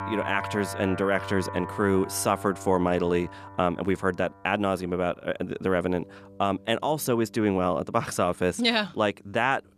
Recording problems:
background music; noticeable; throughout; 10 dB below the speech

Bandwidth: 14 kHz